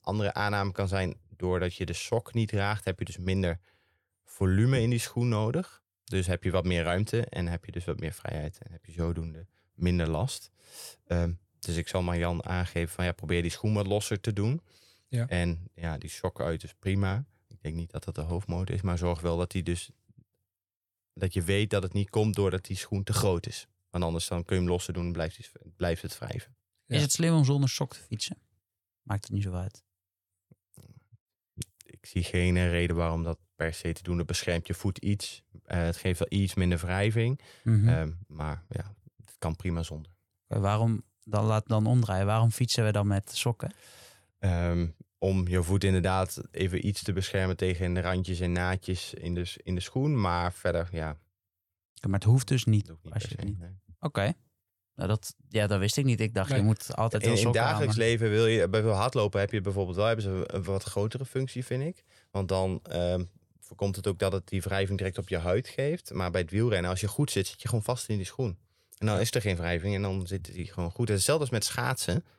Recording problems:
none

